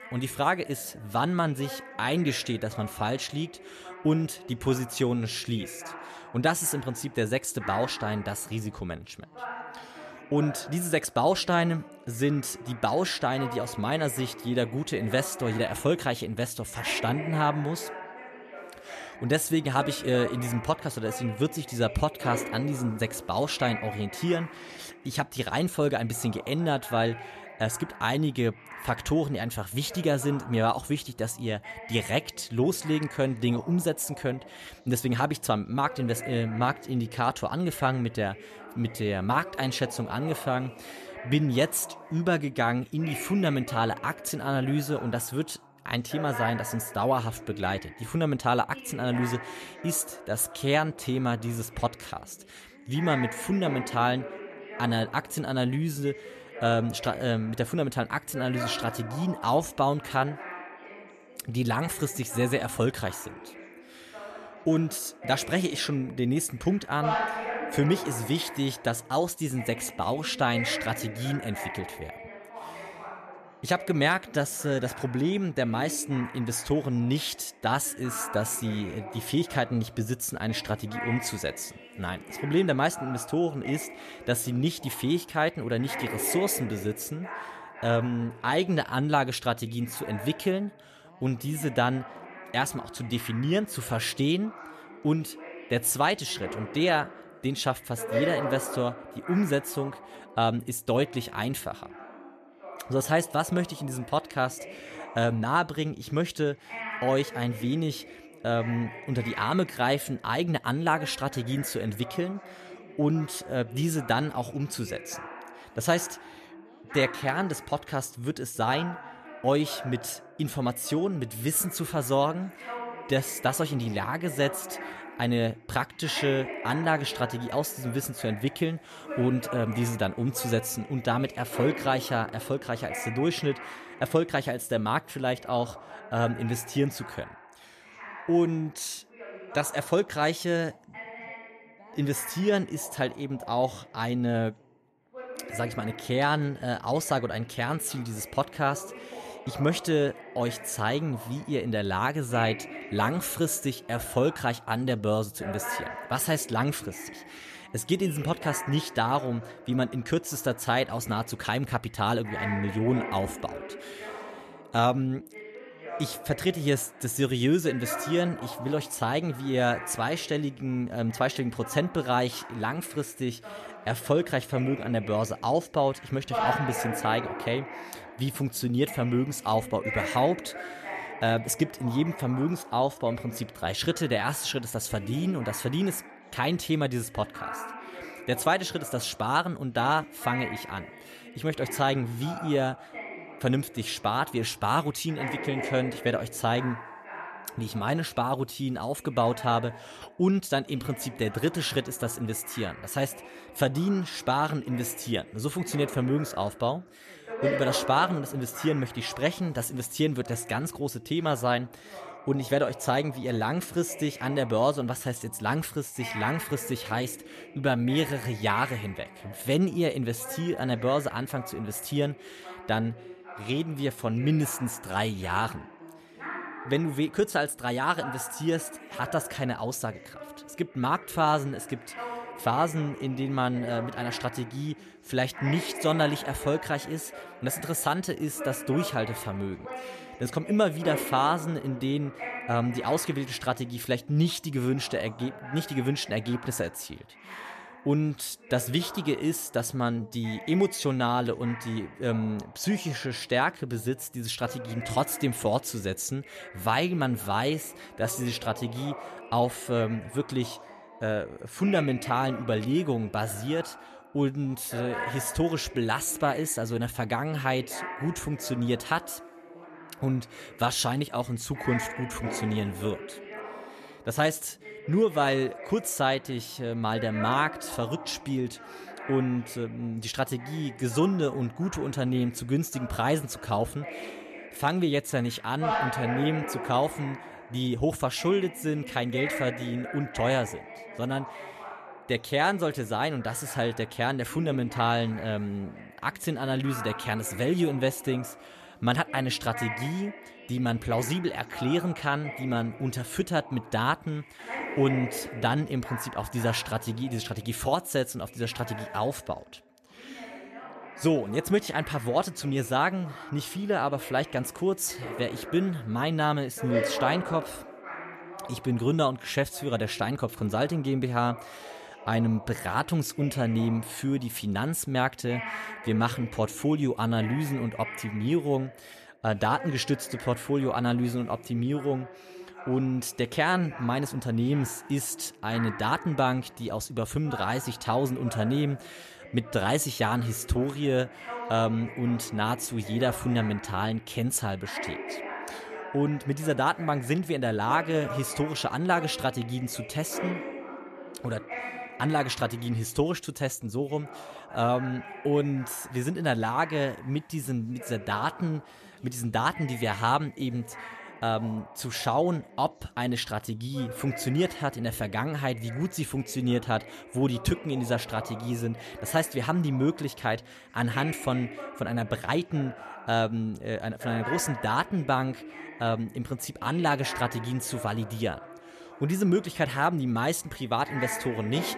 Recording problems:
background chatter; noticeable; throughout; 2 voices, 10 dB below the speech

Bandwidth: 14 kHz